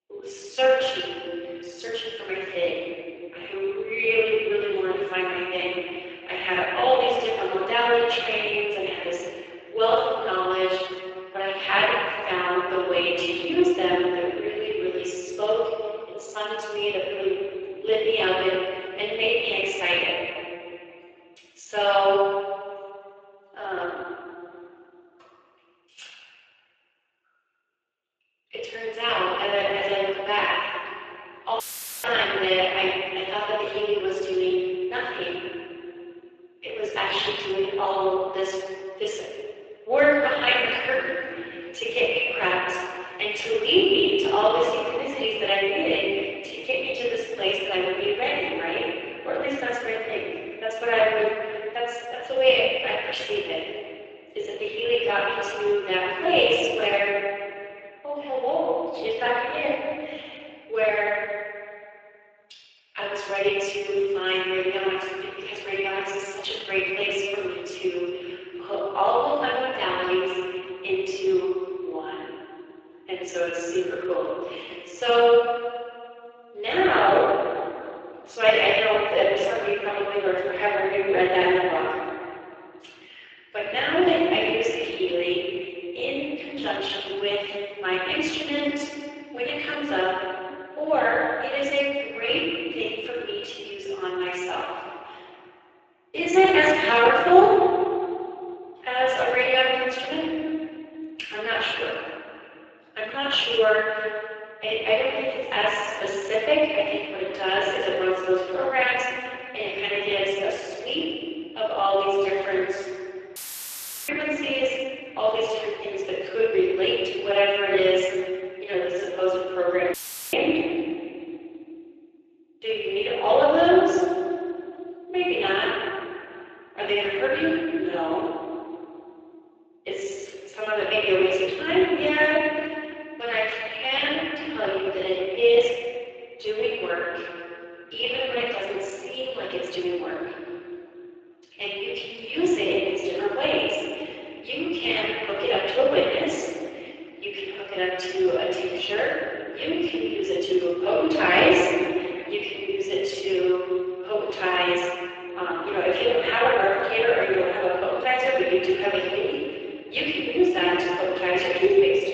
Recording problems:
room echo; strong; dies away in 2.5 s
off-mic speech; far
thin; very; fading below 350 Hz
garbled, watery; slightly; nothing above 7.5 kHz
audio cutting out; filled with static; at 32 s, at 1:53 for 0.5 s and at 2:00

